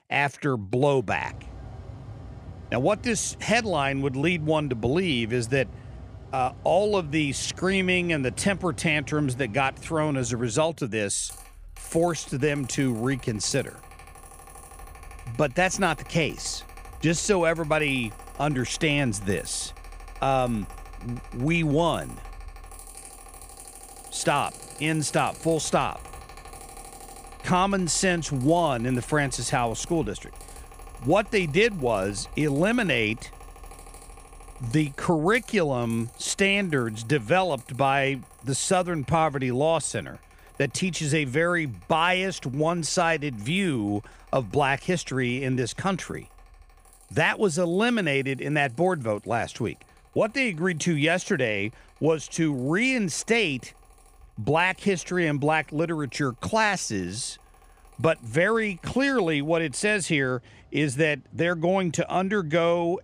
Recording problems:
machinery noise; faint; throughout; 20 dB below the speech

